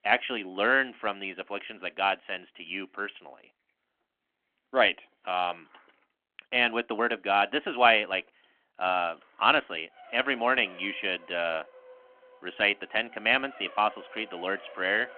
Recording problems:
phone-call audio
traffic noise; faint; from 5 s on; 25 dB below the speech

